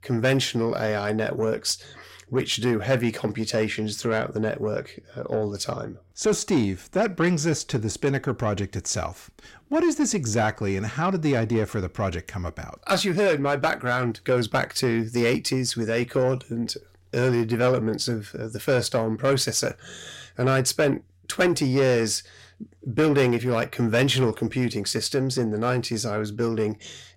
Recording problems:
distortion; slight; 10 dB below the speech

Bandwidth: 16 kHz